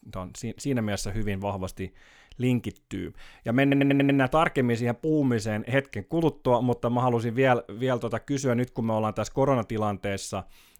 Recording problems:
audio stuttering; at 3.5 s

